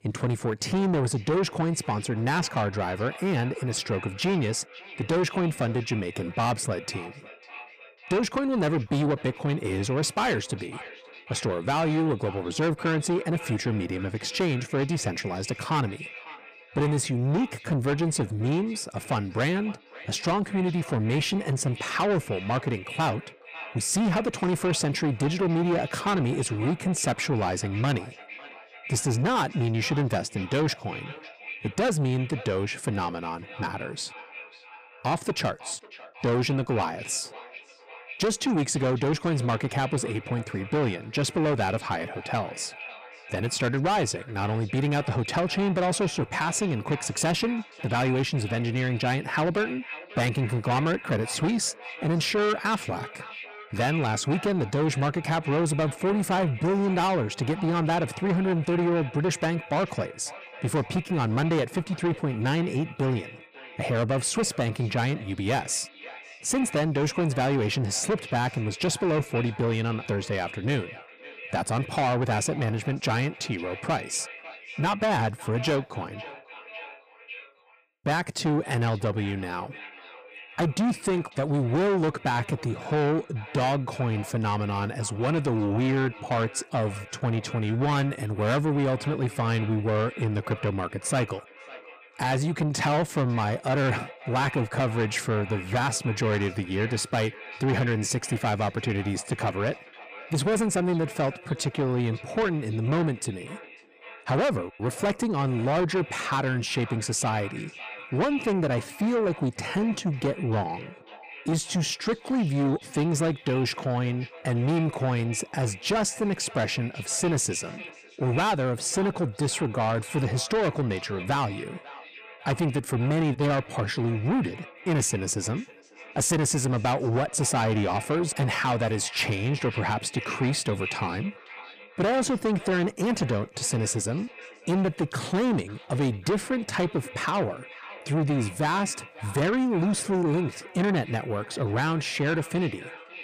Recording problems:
distortion; heavy; 8 dB below the speech
echo of what is said; noticeable; throughout; 550 ms later, 15 dB below the speech

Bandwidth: 15 kHz